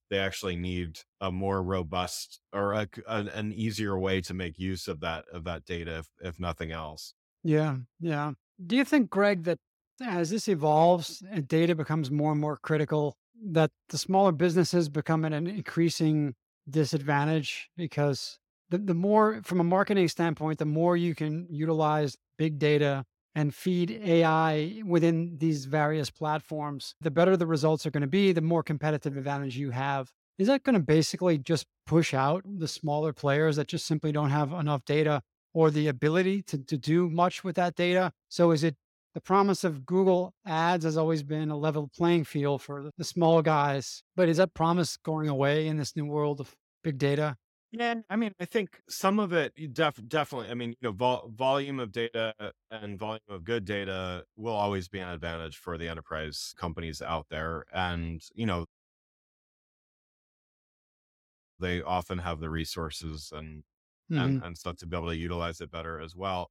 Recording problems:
audio cutting out; at 59 s for 3 s

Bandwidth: 16.5 kHz